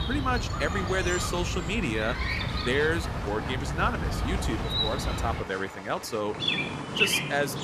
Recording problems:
animal sounds; very loud; throughout; 1 dB above the speech
traffic noise; noticeable; throughout; 15 dB below the speech
crowd noise; noticeable; from 1.5 s on; 15 dB below the speech

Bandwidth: 14.5 kHz